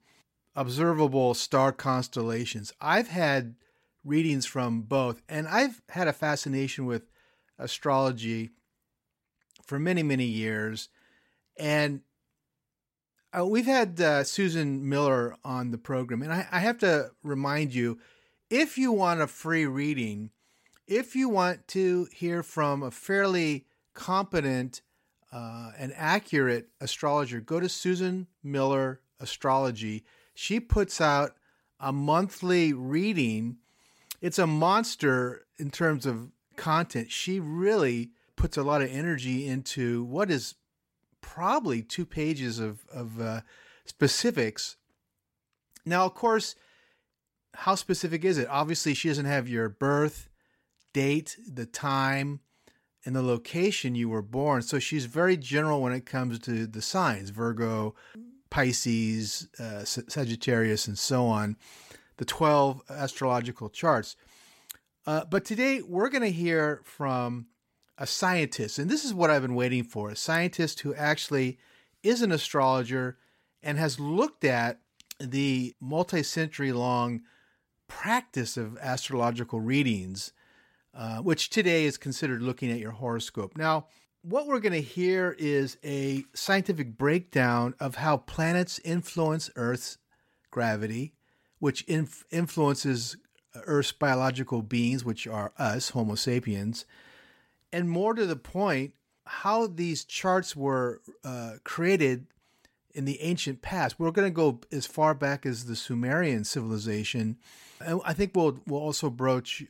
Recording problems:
none

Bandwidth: 16 kHz